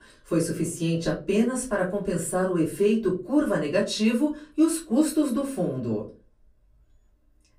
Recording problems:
off-mic speech; far
room echo; very slight; dies away in 0.3 s

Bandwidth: 15.5 kHz